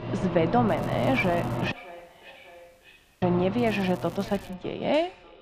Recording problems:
muffled; slightly; fading above 4 kHz
echo of what is said; faint; throughout; 600 ms later, 20 dB below the speech
household noises; loud; throughout; 6 dB below the speech
crackling; faint; at 0.5 s and at 3.5 s; 25 dB below the speech
audio cutting out; at 1.5 s for 1.5 s

